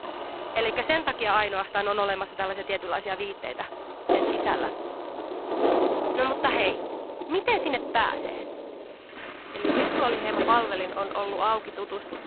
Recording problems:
phone-call audio; poor line; nothing above 4 kHz
rain or running water; loud; throughout; 3 dB below the speech
household noises; faint; throughout; 25 dB below the speech

